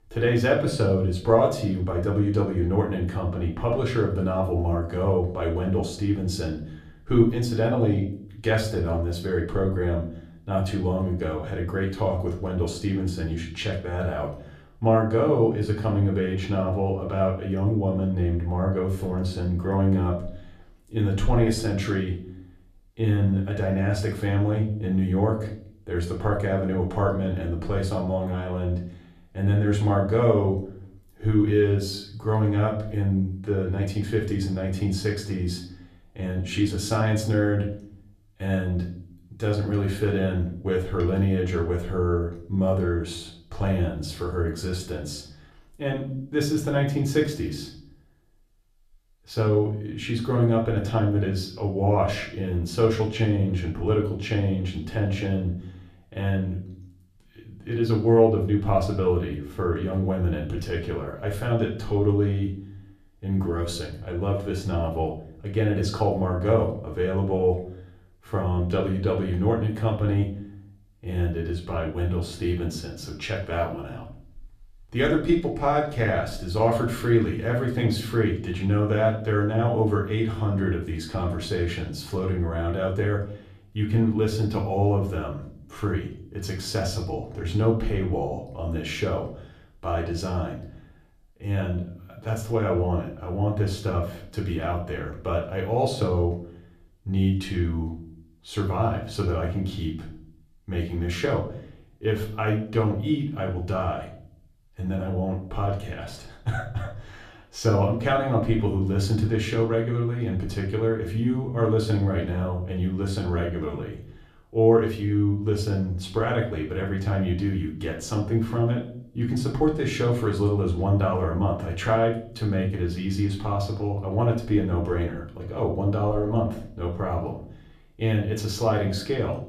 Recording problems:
off-mic speech; far
room echo; slight; dies away in 0.5 s

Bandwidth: 14.5 kHz